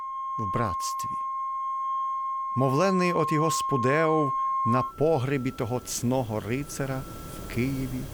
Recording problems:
background music; loud; throughout; 2 dB below the speech

